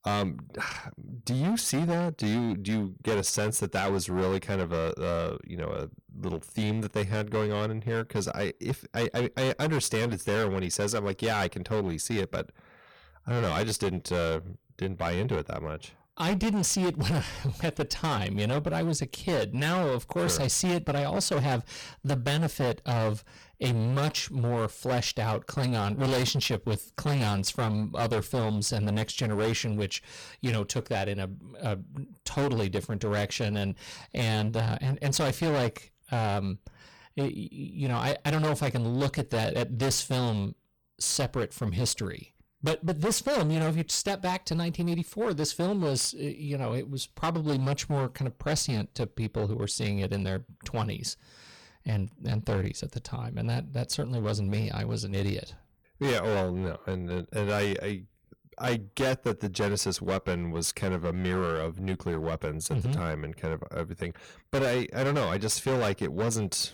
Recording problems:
distortion; heavy; 15% of the sound clipped

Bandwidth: 18.5 kHz